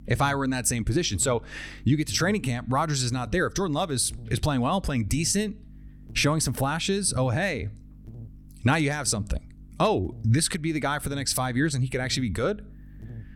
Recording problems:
electrical hum; faint; throughout; 50 Hz, 30 dB below the speech

